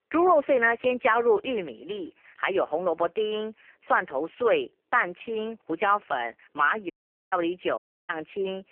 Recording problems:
phone-call audio; poor line; nothing above 3 kHz
audio cutting out; at 7 s and at 8 s

